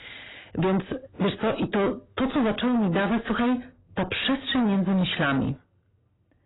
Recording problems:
distortion; heavy; 5 dB below the speech
garbled, watery; badly; nothing above 4 kHz

